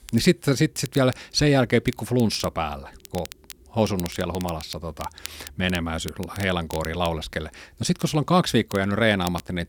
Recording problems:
crackle, like an old record; noticeable; 20 dB below the speech

